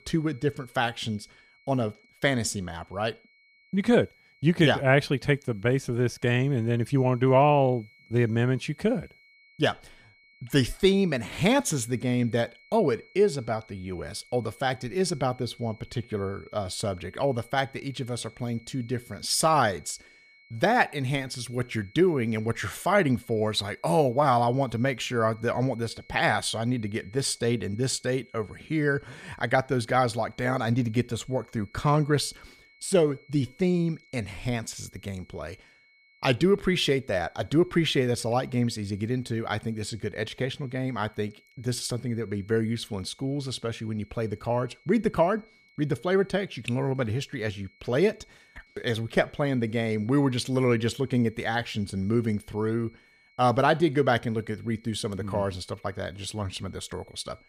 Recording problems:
high-pitched whine; faint; throughout; 2 kHz, 30 dB below the speech

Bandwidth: 14.5 kHz